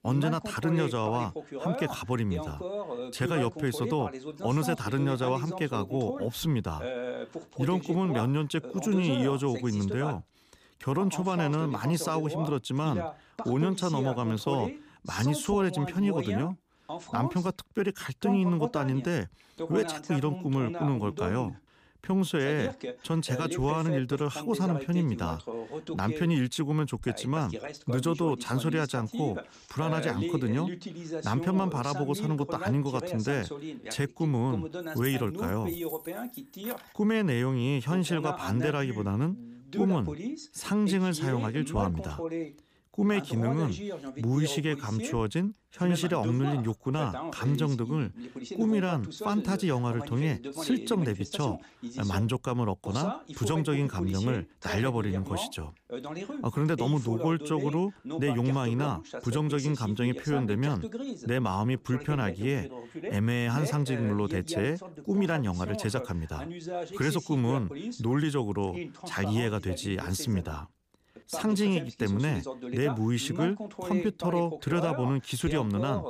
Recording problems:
voice in the background; loud; throughout; 9 dB below the speech
jangling keys; faint; from 35 to 37 s; peak 10 dB below the speech

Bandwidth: 15 kHz